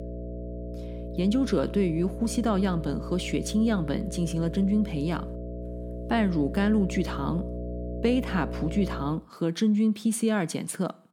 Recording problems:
electrical hum; loud; until 9 s; 60 Hz, 10 dB below the speech

